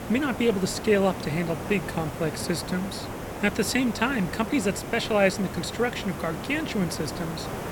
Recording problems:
hiss; loud; throughout; 8 dB below the speech

